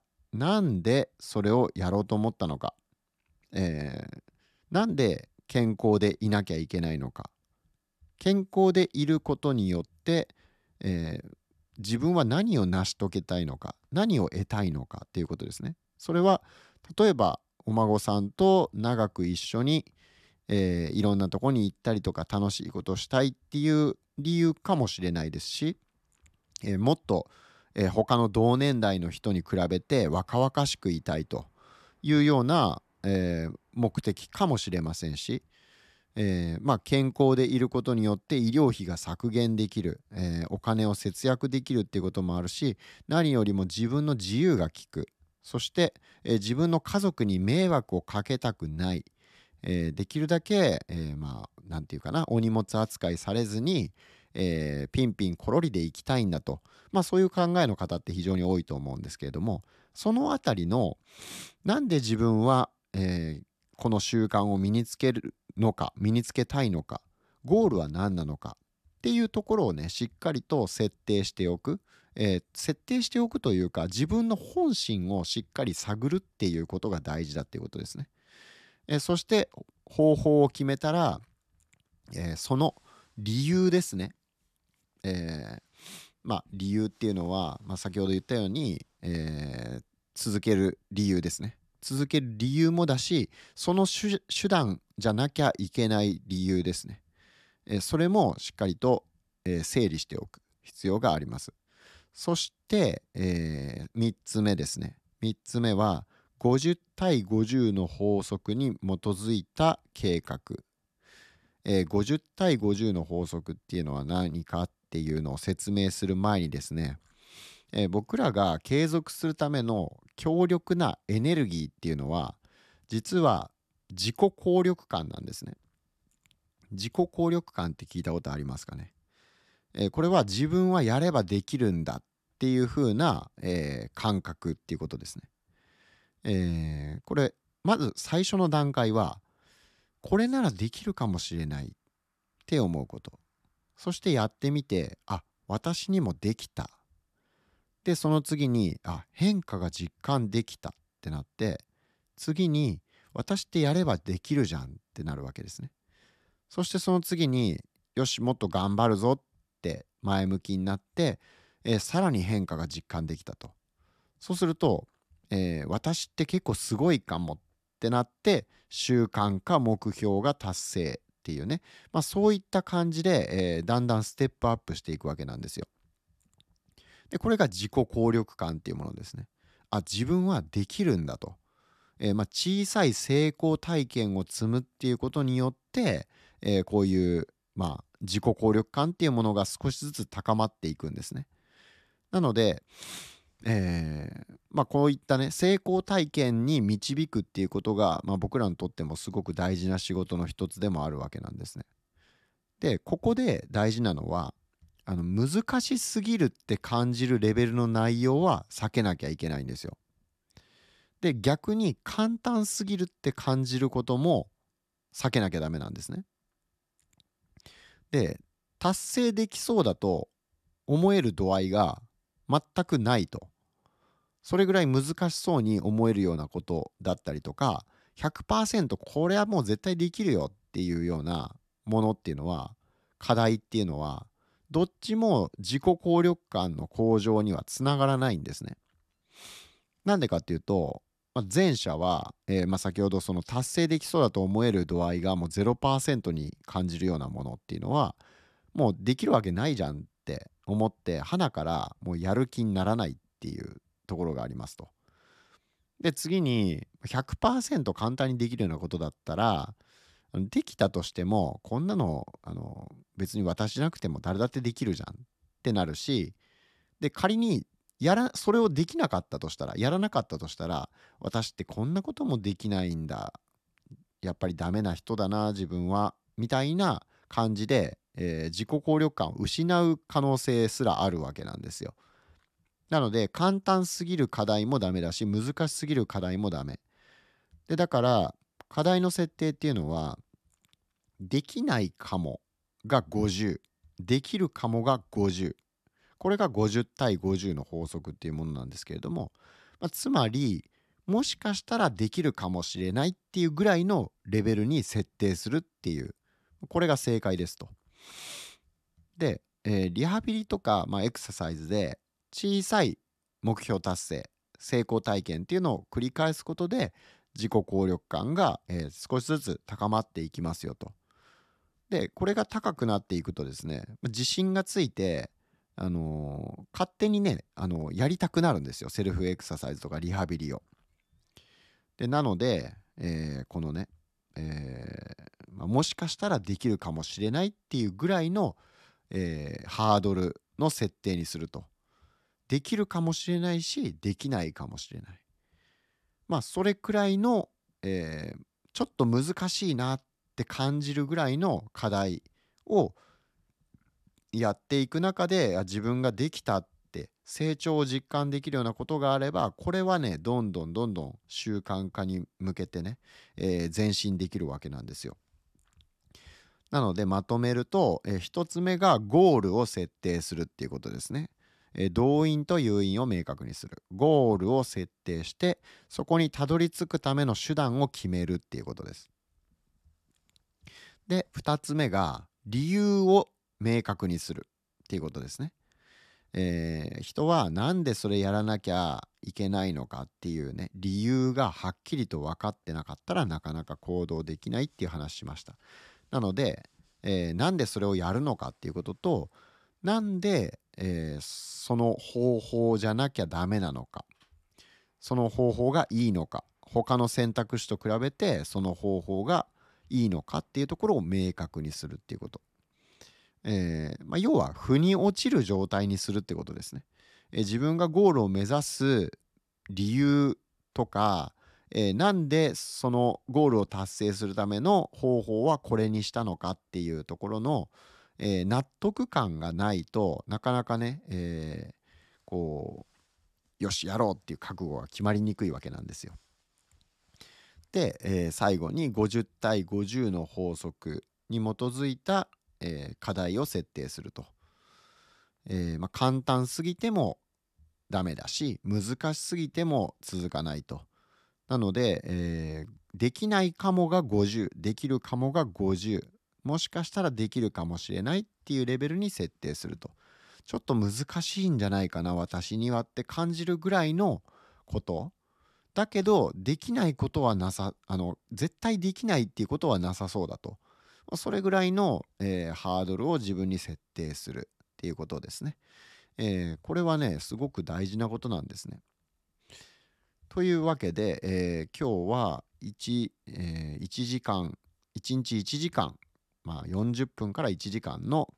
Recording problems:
none

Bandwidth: 14 kHz